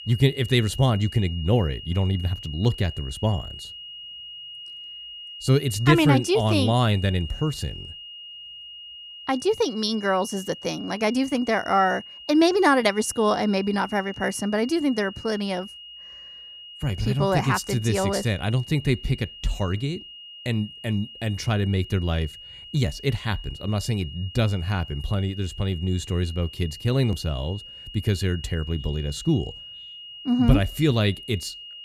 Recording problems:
high-pitched whine; noticeable; throughout; 3 kHz, 15 dB below the speech

